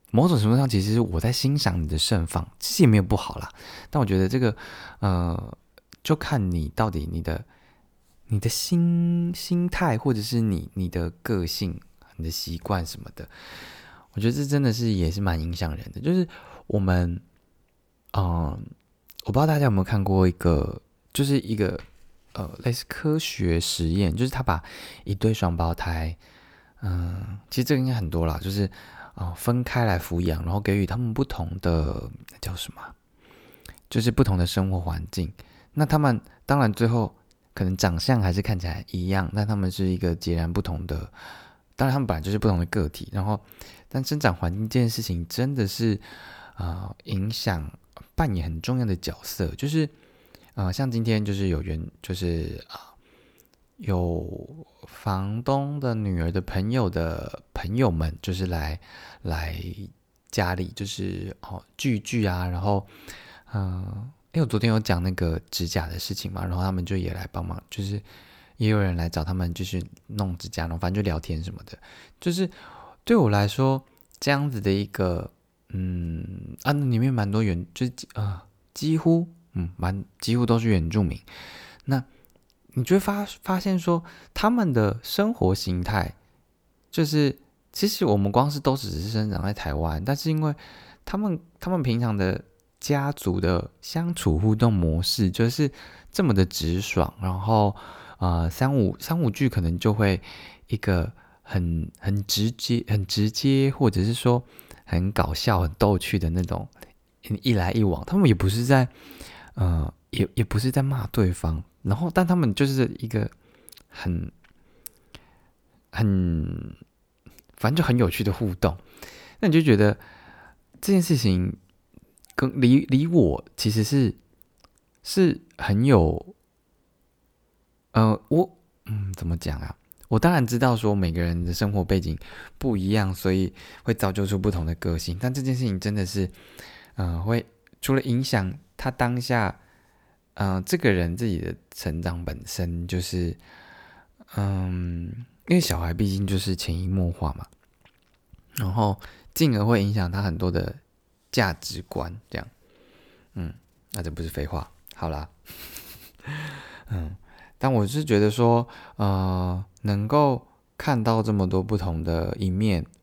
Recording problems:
none

